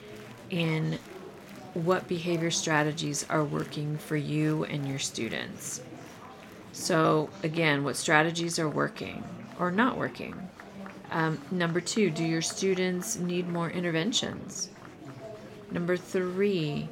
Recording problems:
murmuring crowd; noticeable; throughout; 15 dB below the speech

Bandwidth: 16.5 kHz